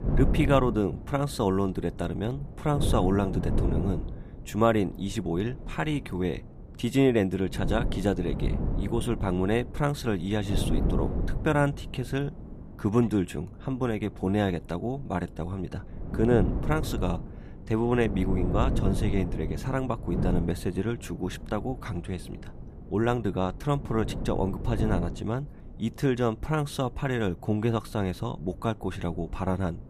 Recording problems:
wind noise on the microphone; occasional gusts; 10 dB below the speech

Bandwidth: 14.5 kHz